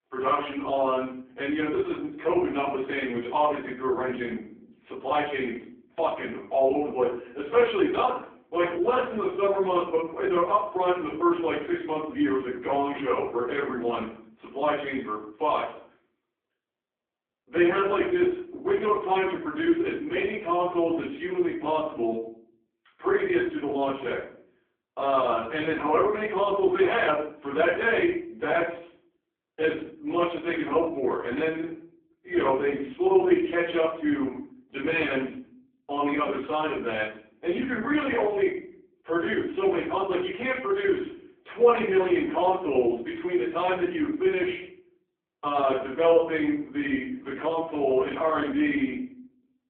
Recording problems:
phone-call audio; poor line
off-mic speech; far
room echo; noticeable; dies away in 0.5 s

